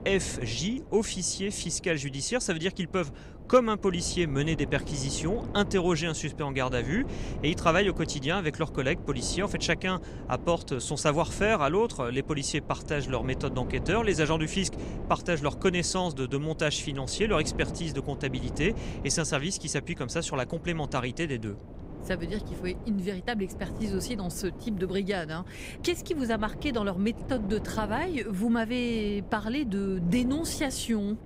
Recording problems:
wind noise on the microphone; occasional gusts; 15 dB below the speech

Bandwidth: 15.5 kHz